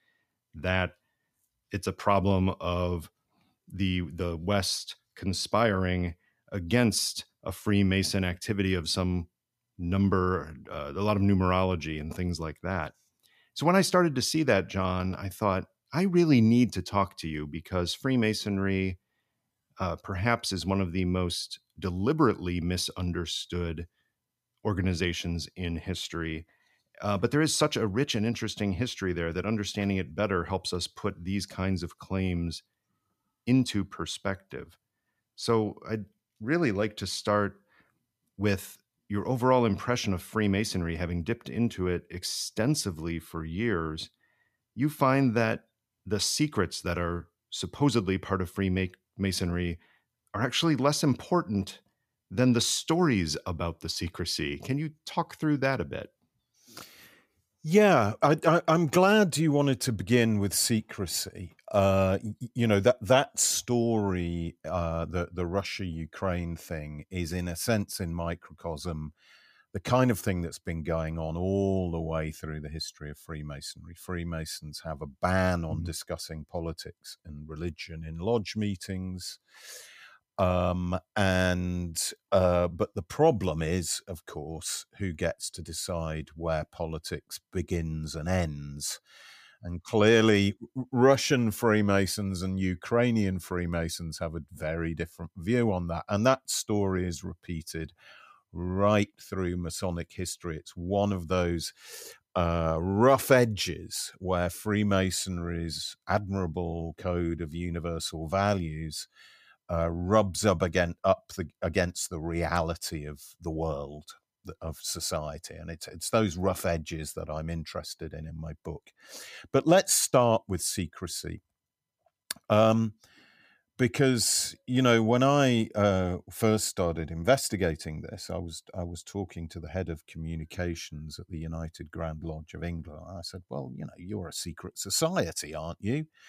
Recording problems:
none

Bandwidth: 15 kHz